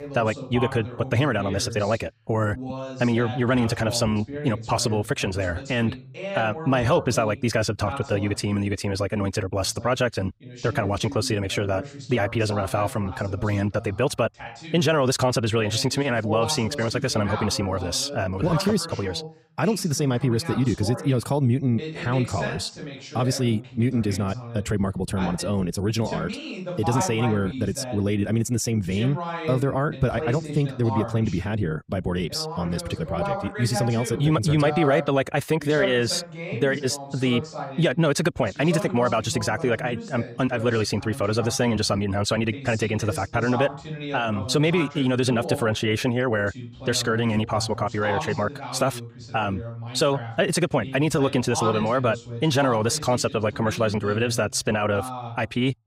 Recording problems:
wrong speed, natural pitch; too fast; 1.5 times normal speed
voice in the background; noticeable; throughout; 10 dB below the speech

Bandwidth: 15.5 kHz